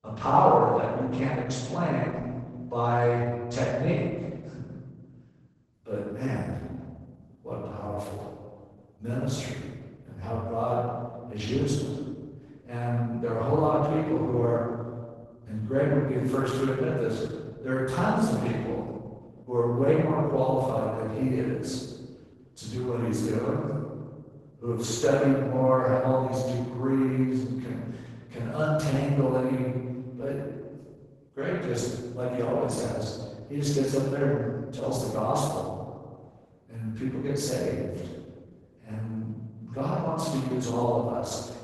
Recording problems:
room echo; strong; dies away in 1.4 s
off-mic speech; far
garbled, watery; badly; nothing above 12 kHz

